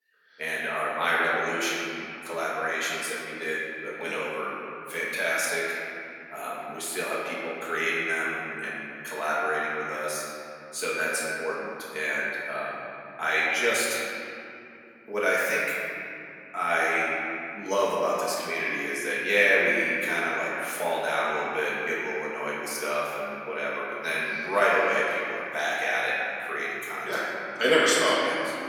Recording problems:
room echo; strong; dies away in 2.9 s
off-mic speech; far
thin; somewhat; fading below 250 Hz

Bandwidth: 18 kHz